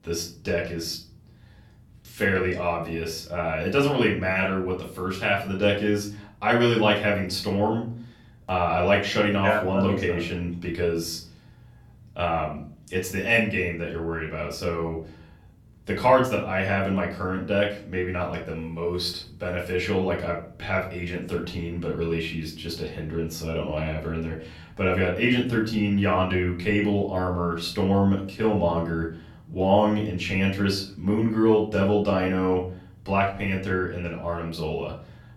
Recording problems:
off-mic speech; far
room echo; slight; dies away in 0.4 s

